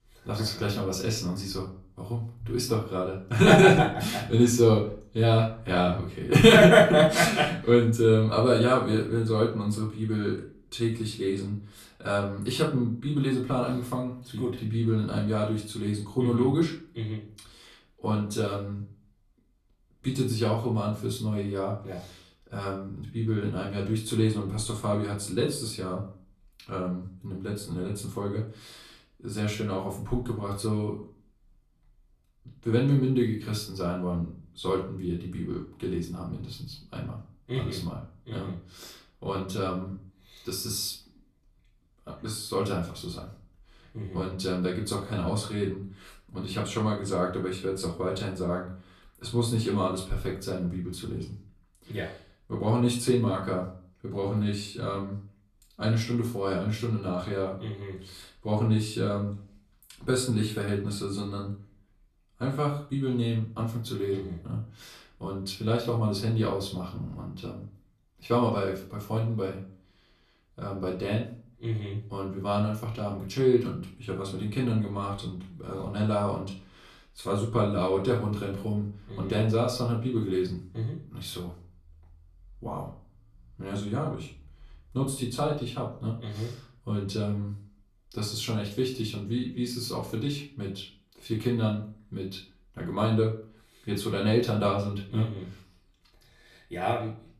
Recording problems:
off-mic speech; far
room echo; slight; dies away in 0.4 s

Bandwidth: 14 kHz